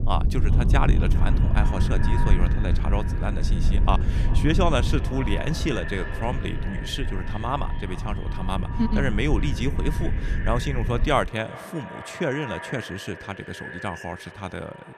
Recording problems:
echo of what is said; strong; throughout; 400 ms later, 10 dB below the speech
low rumble; noticeable; until 11 s; 10 dB below the speech

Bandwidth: 14.5 kHz